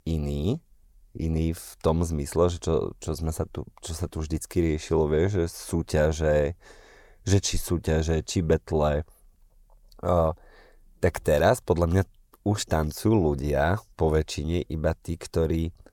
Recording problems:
none

